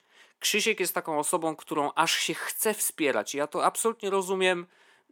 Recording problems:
thin; somewhat; fading below 250 Hz

